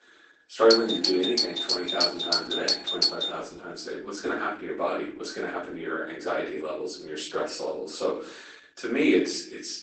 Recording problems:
off-mic speech; far
garbled, watery; badly; nothing above 8 kHz
thin; somewhat; fading below 300 Hz
room echo; slight; dies away in 0.5 s
doorbell; loud; from 0.5 to 3.5 s; peak 6 dB above the speech

